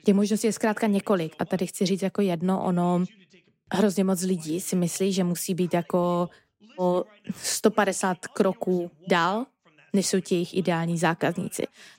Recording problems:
voice in the background; faint; throughout; 30 dB below the speech

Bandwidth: 16 kHz